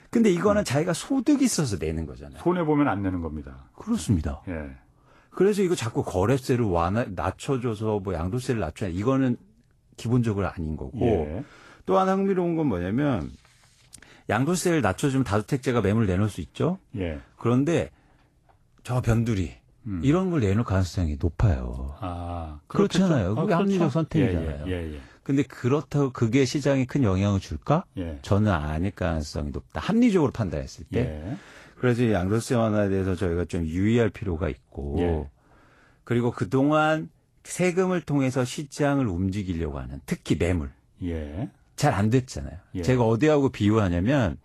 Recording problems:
garbled, watery; slightly; nothing above 12 kHz

